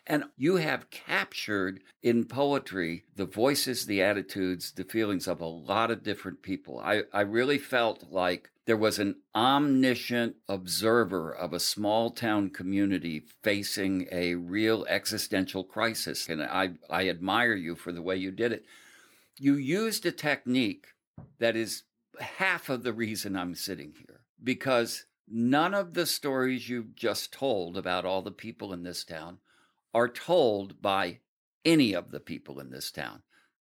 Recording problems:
none

